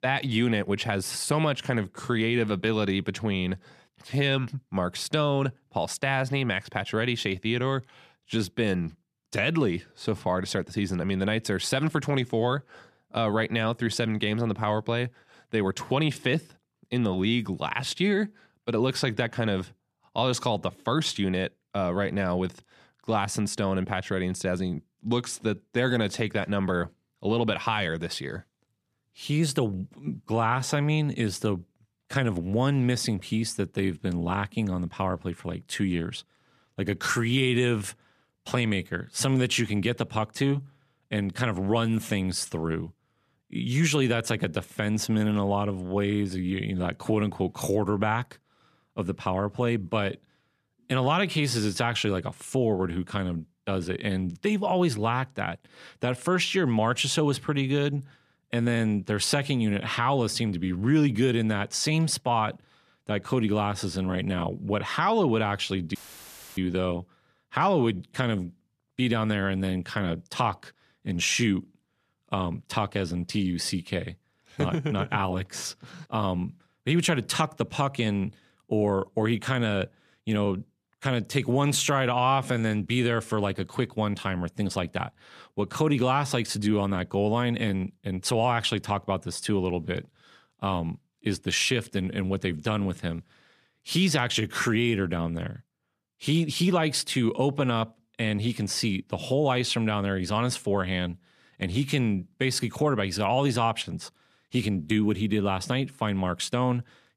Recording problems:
audio cutting out; filled with static; at 1:06 for 0.5 s

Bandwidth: 14.5 kHz